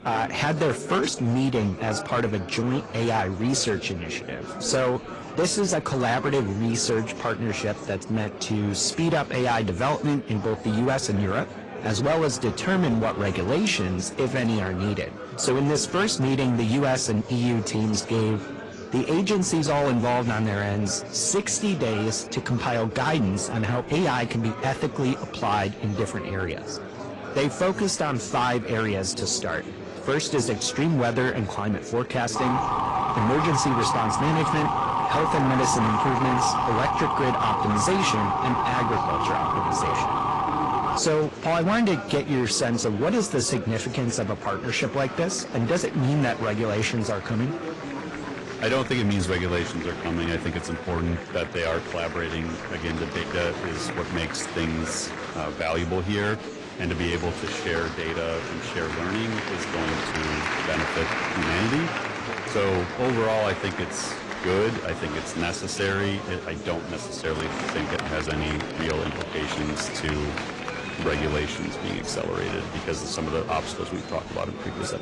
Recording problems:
distortion; slight; 8% of the sound clipped
garbled, watery; slightly
murmuring crowd; loud; throughout; 8 dB below the speech
siren; loud; from 32 to 41 s; peak 3 dB above the speech

